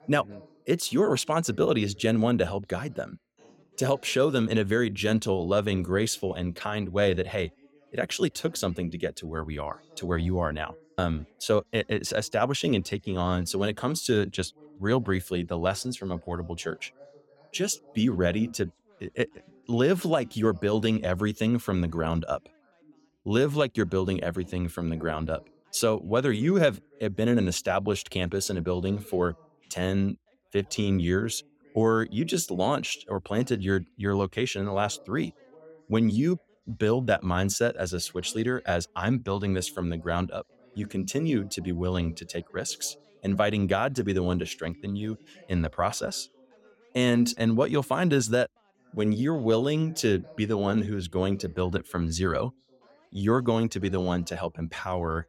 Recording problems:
background chatter; faint; throughout; 2 voices, 30 dB below the speech

